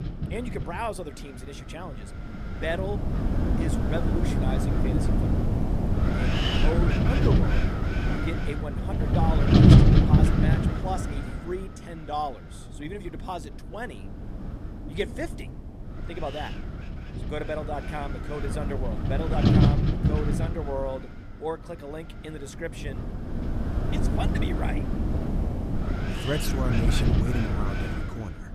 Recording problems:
wind noise on the microphone; heavy; 3 dB above the speech

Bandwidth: 14 kHz